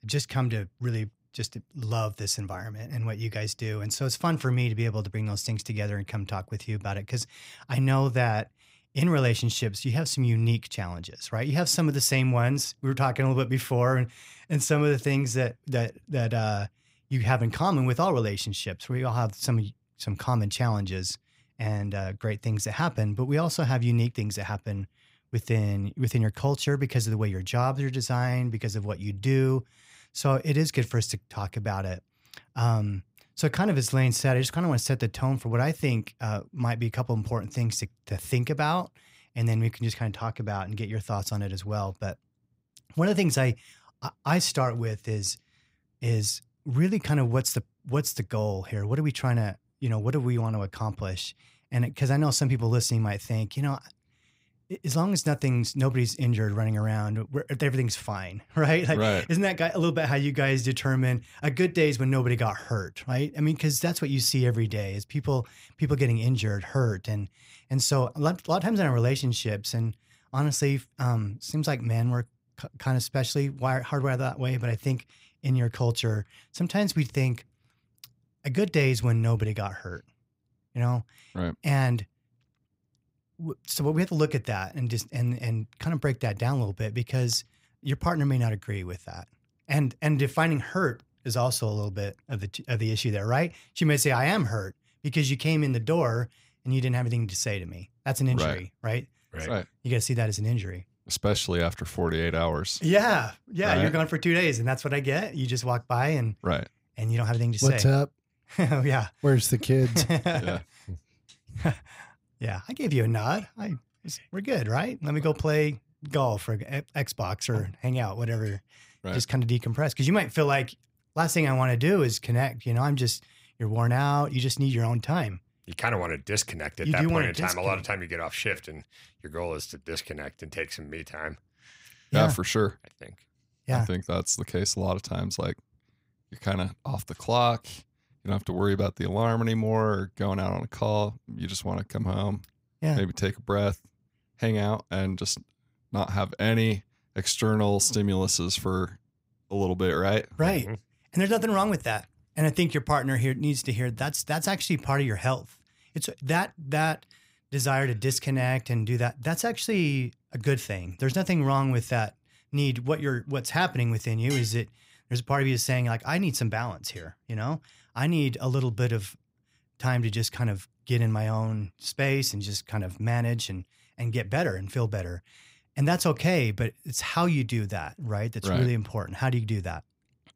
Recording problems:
none

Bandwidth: 15.5 kHz